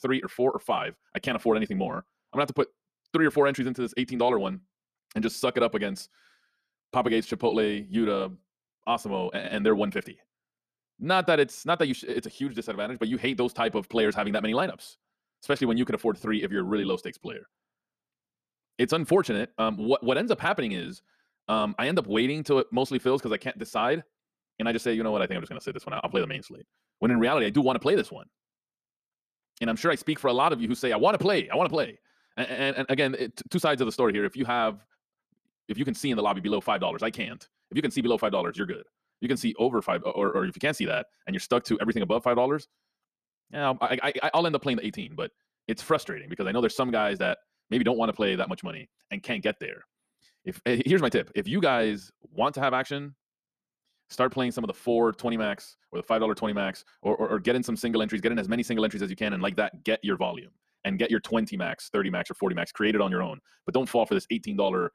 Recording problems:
wrong speed, natural pitch; too fast; 1.5 times normal speed

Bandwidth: 14.5 kHz